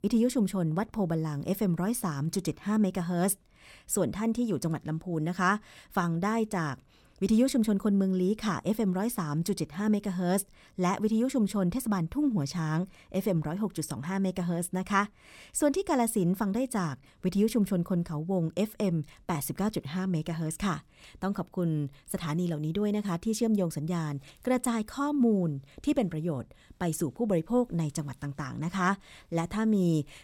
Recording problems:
none

